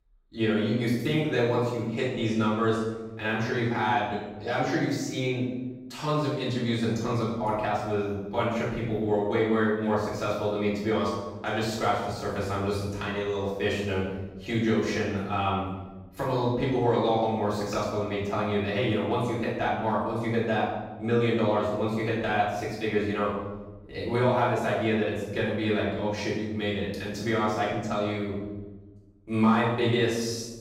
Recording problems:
off-mic speech; far
room echo; noticeable; dies away in 1 s

